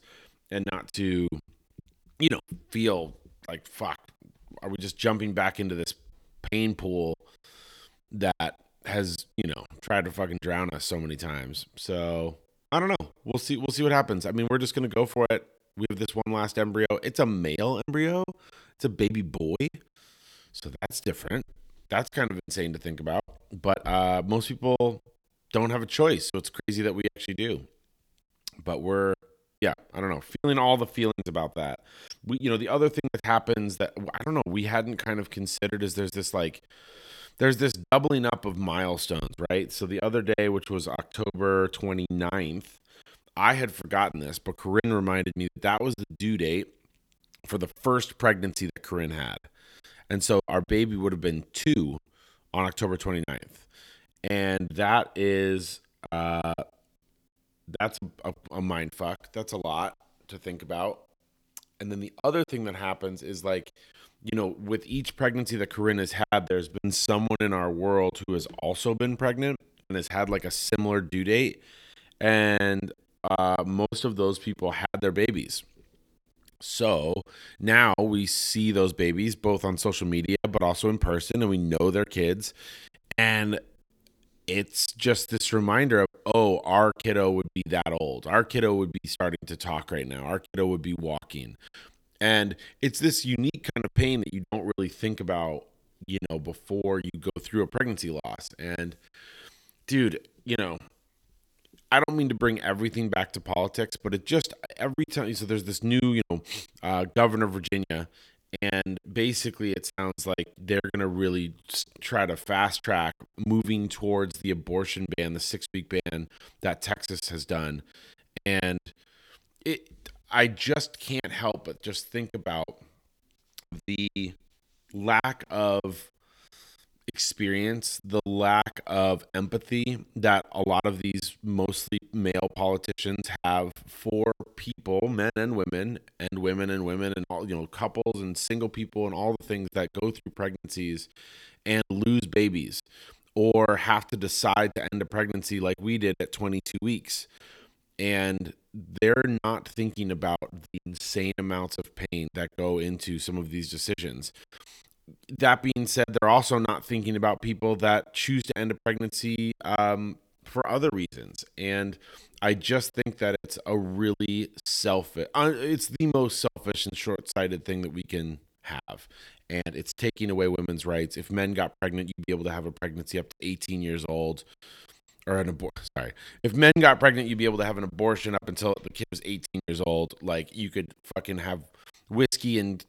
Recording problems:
choppy; very; 10% of the speech affected

